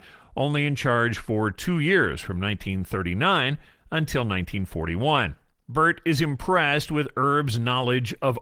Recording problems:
garbled, watery; slightly; nothing above 19 kHz

